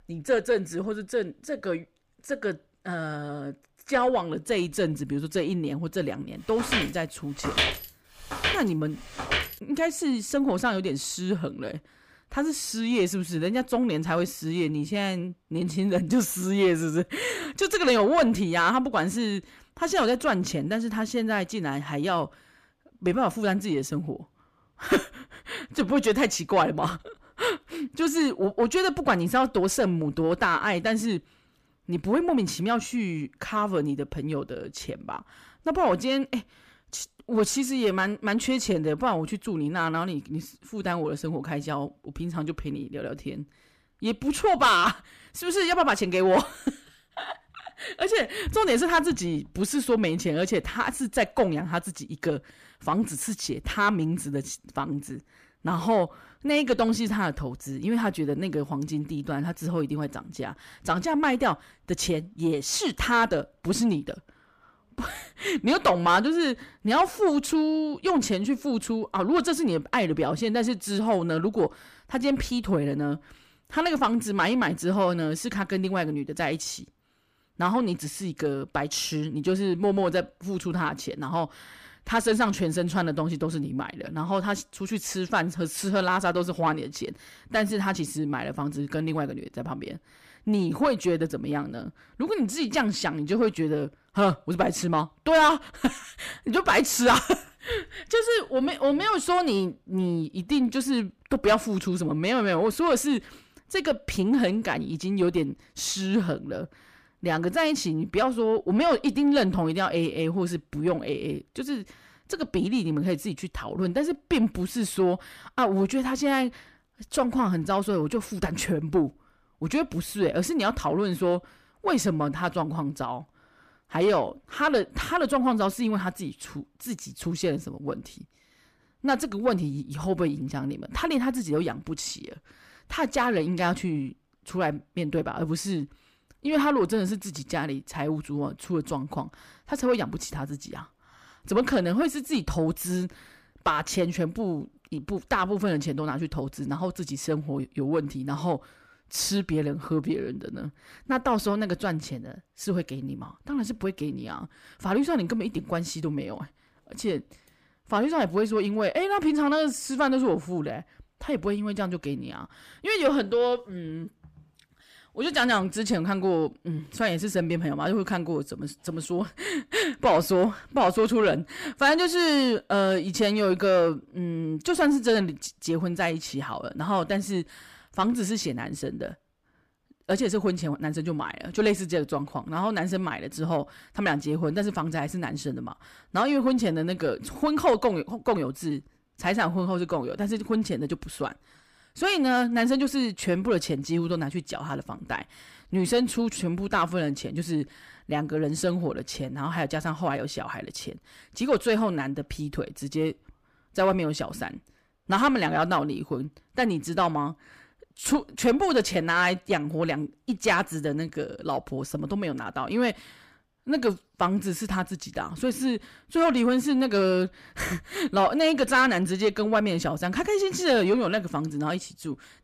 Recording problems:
distortion; slight; 10 dB below the speech
footsteps; loud; from 6.5 to 9.5 s; peak 2 dB above the speech

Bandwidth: 15 kHz